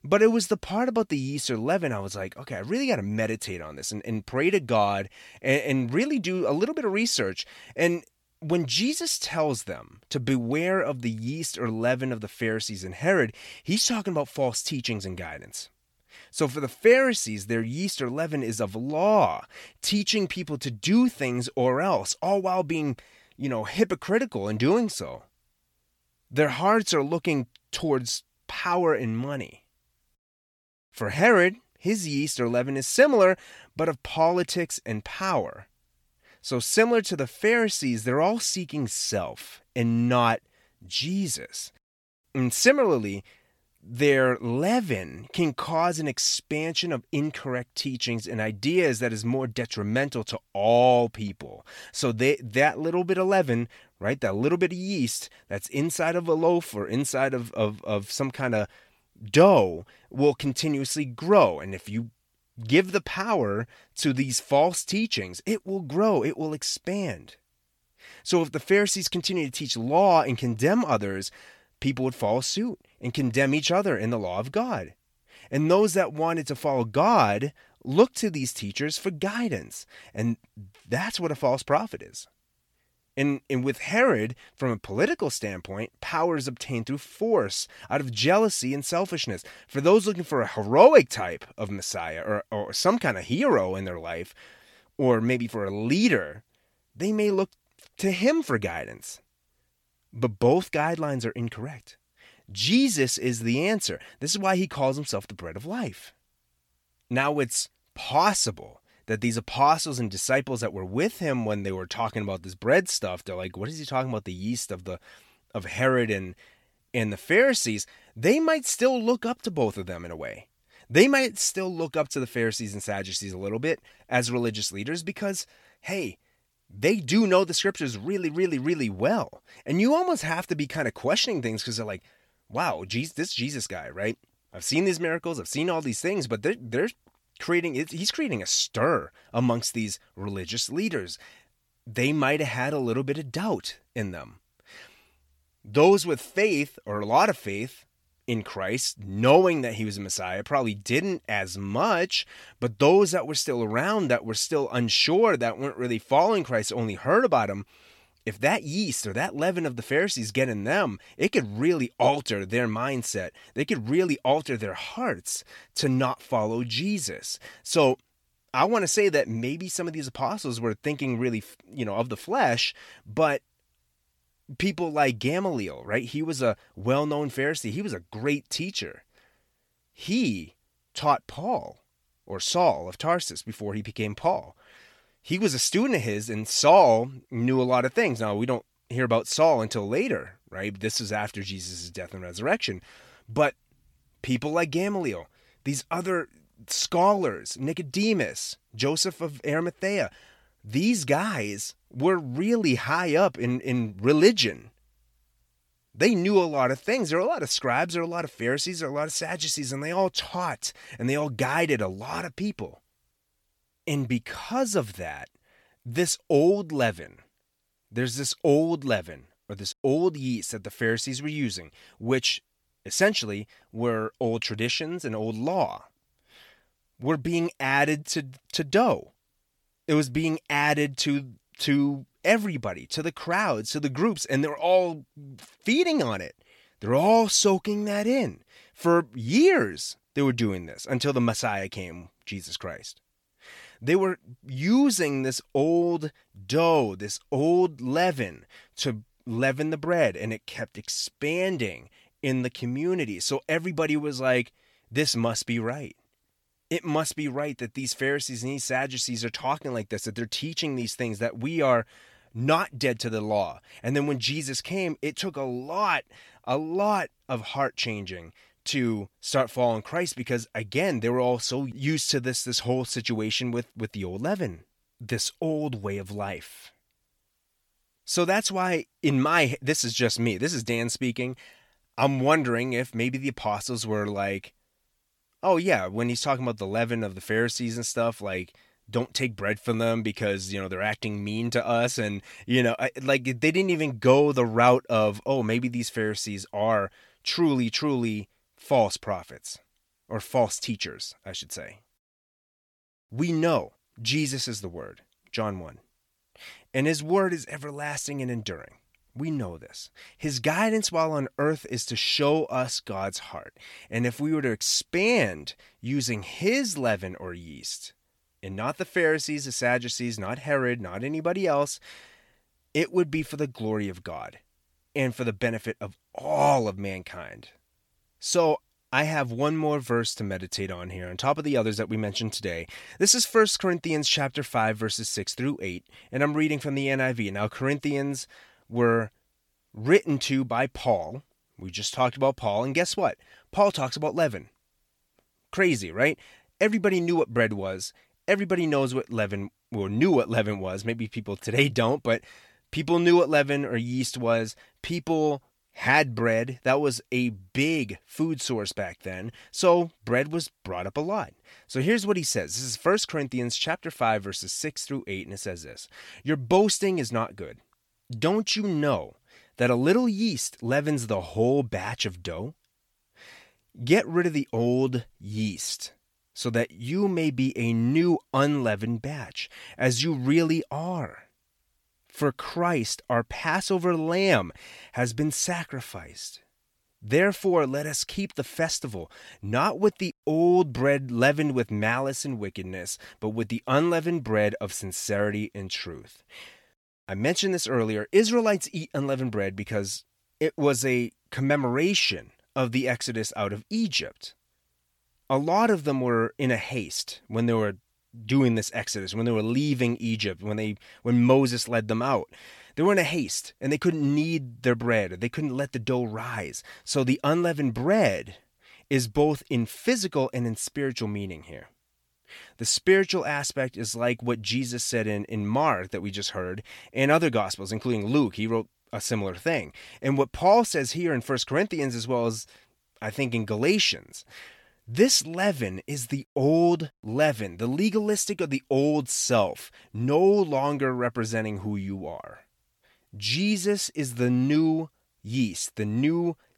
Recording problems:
none

